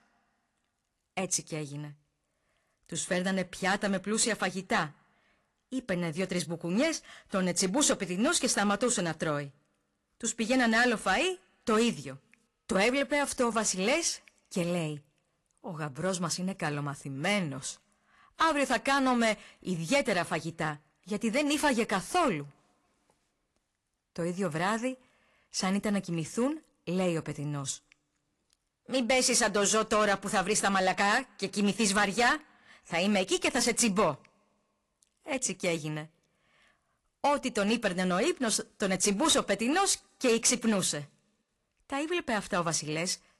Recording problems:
distortion; slight; 3% of the sound clipped
garbled, watery; slightly; nothing above 11 kHz

